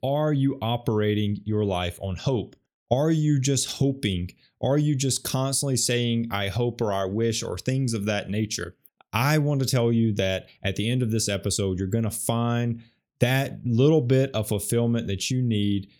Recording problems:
none

